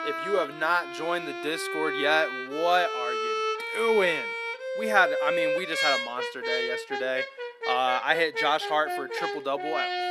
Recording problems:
thin; somewhat; fading below 300 Hz
background music; loud; throughout; 3 dB below the speech

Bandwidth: 14.5 kHz